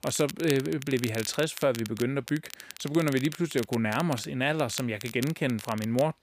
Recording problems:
crackle, like an old record; noticeable; 15 dB below the speech

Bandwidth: 15 kHz